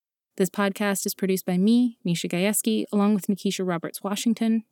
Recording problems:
none

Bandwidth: 18.5 kHz